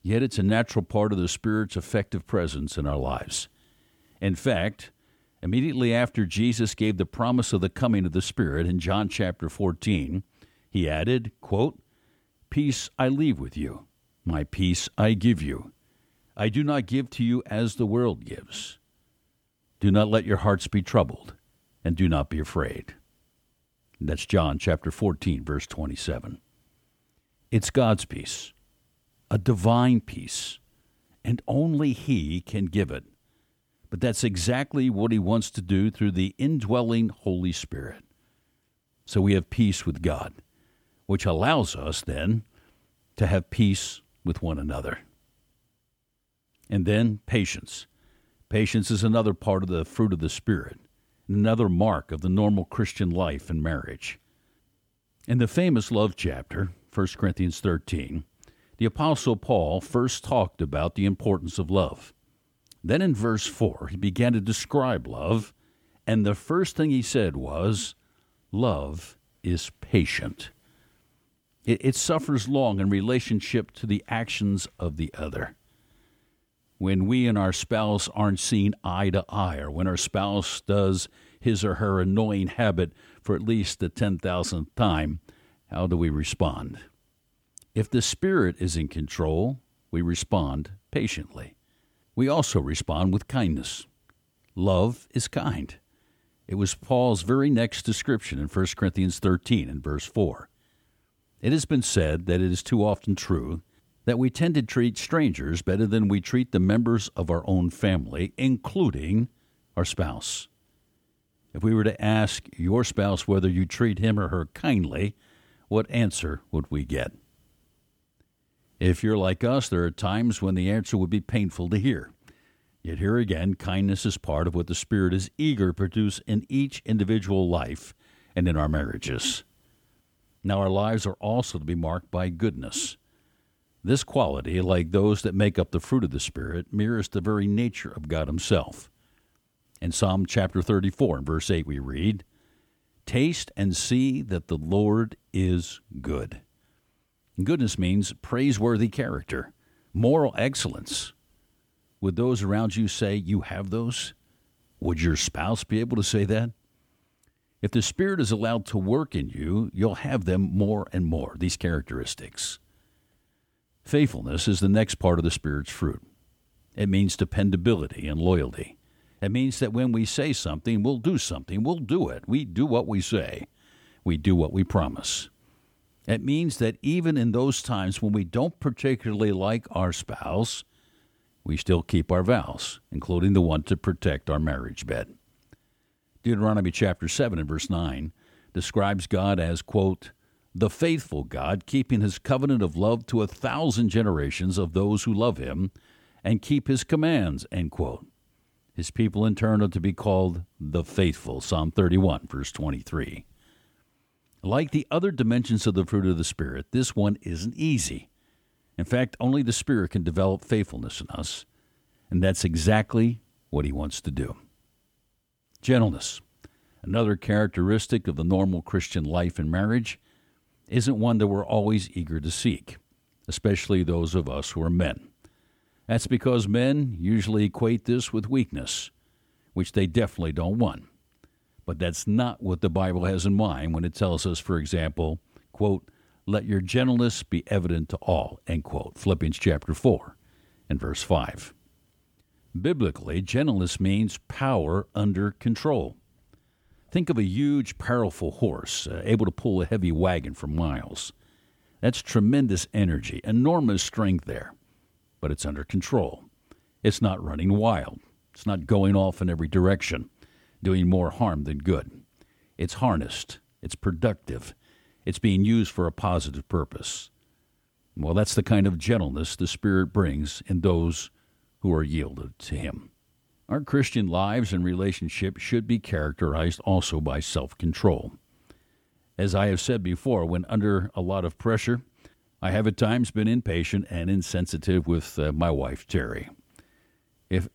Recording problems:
none

